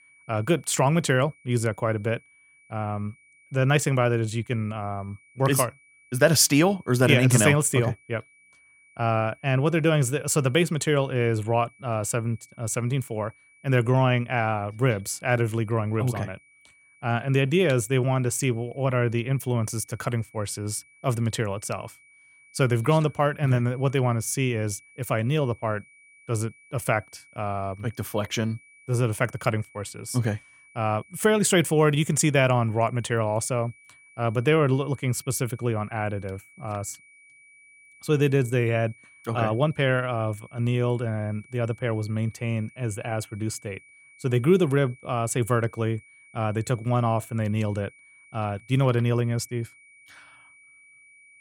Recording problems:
high-pitched whine; faint; throughout; 2.5 kHz, 30 dB below the speech

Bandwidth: 18 kHz